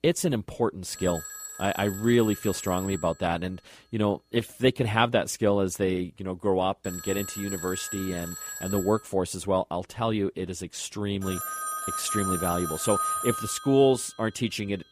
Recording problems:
alarms or sirens; loud; throughout; 6 dB below the speech

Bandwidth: 15 kHz